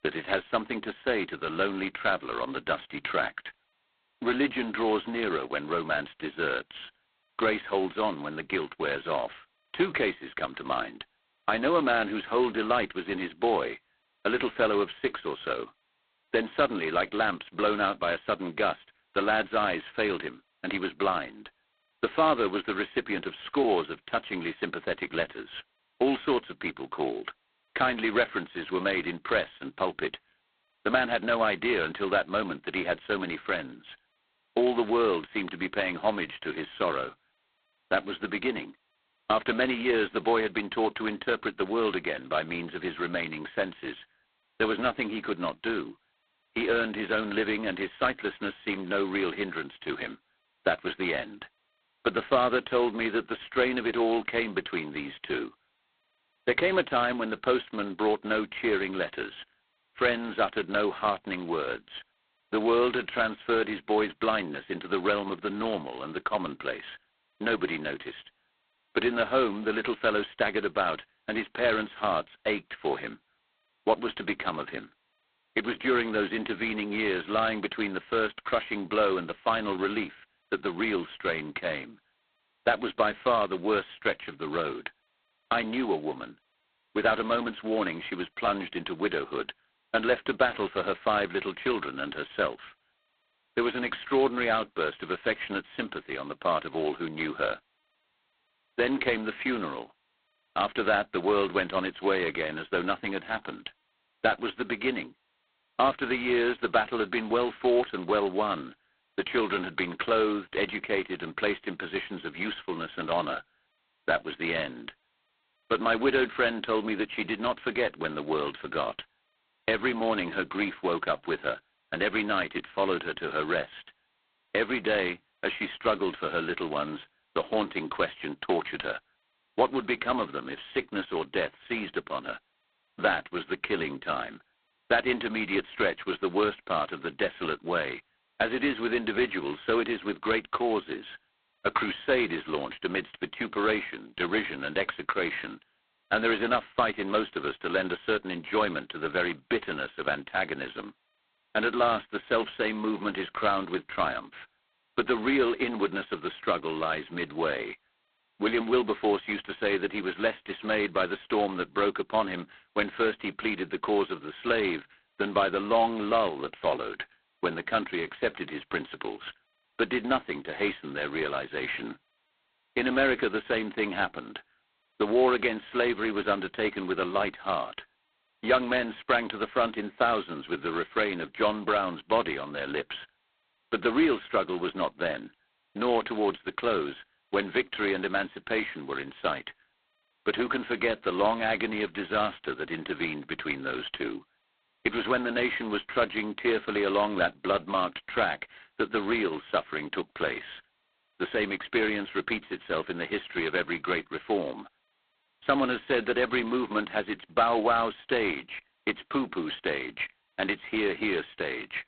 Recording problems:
phone-call audio; poor line; nothing above 4 kHz

